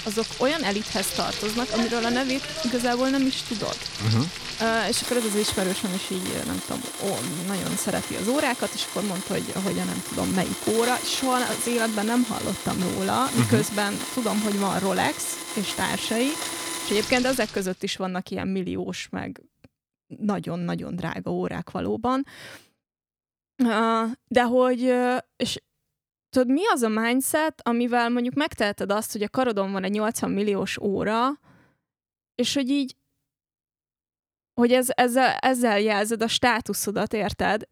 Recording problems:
household noises; loud; until 18 s; 6 dB below the speech

